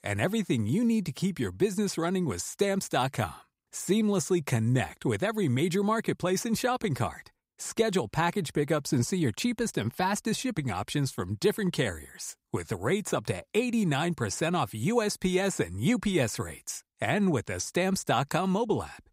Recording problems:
none

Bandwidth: 15.5 kHz